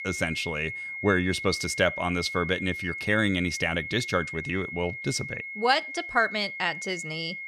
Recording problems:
high-pitched whine; loud; throughout; 2 kHz, 7 dB below the speech

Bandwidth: 14 kHz